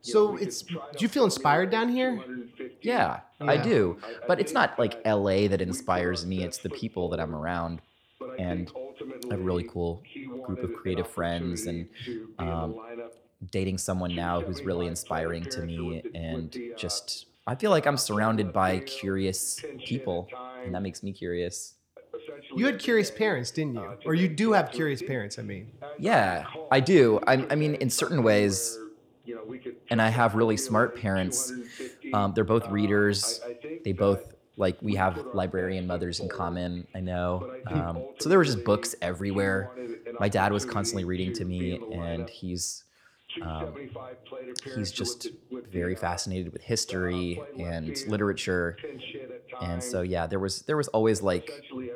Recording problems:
voice in the background; noticeable; throughout; 15 dB below the speech

